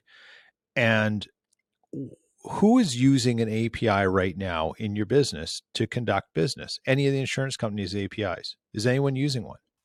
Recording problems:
none

